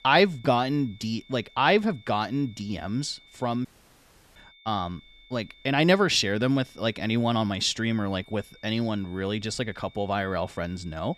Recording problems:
high-pitched whine; faint; throughout; 3.5 kHz, 25 dB below the speech
audio cutting out; at 3.5 s for 0.5 s

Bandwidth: 14 kHz